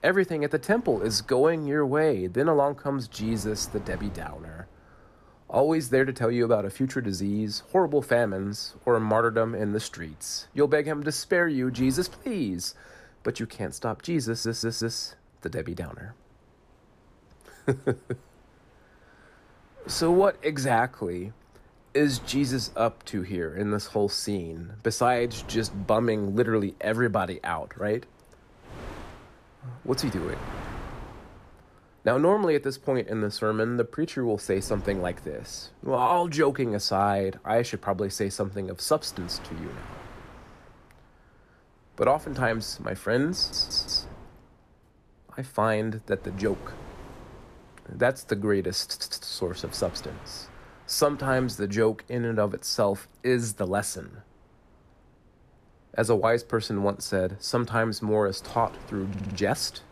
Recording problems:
wind noise on the microphone; occasional gusts; 20 dB below the speech
audio stuttering; 4 times, first at 14 s

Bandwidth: 14.5 kHz